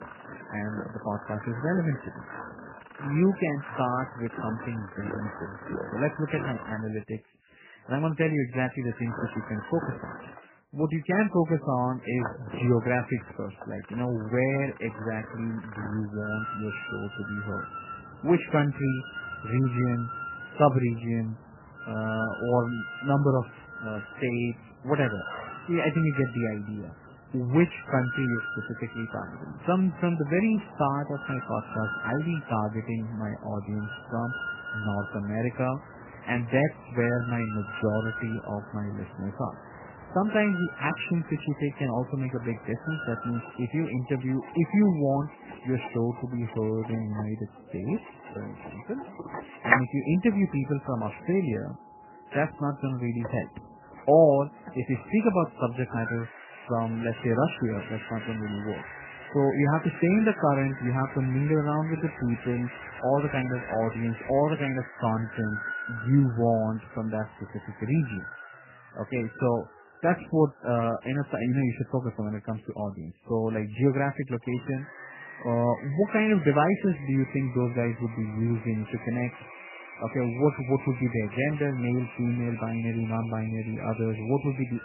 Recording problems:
garbled, watery; badly; nothing above 3 kHz
machinery noise; noticeable; throughout; 10 dB below the speech

